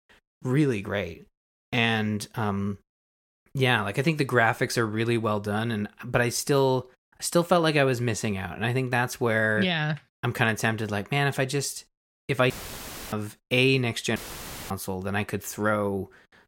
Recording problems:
audio cutting out; filled with static; at 13 s for 0.5 s and at 14 s for 0.5 s

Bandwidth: 16.5 kHz